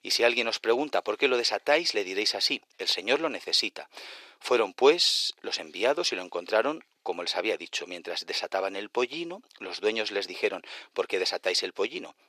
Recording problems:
thin; very; fading below 400 Hz

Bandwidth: 14.5 kHz